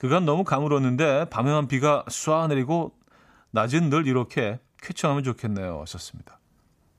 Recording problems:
none

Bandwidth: 15 kHz